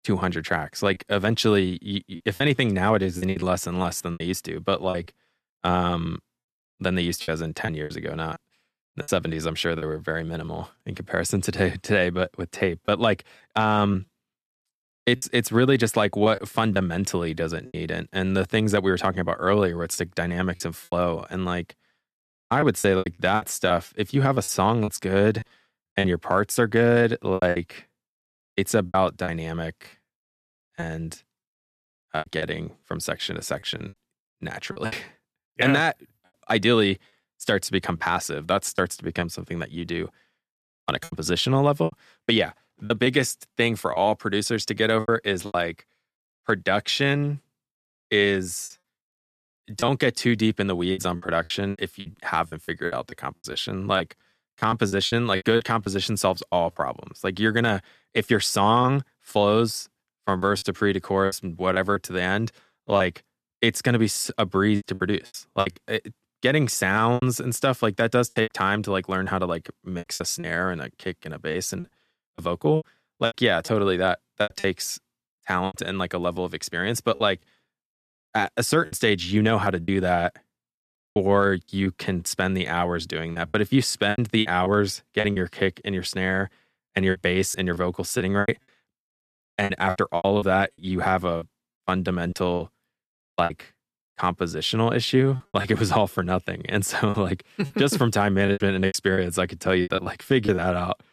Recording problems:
choppy; very; 9% of the speech affected

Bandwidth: 14 kHz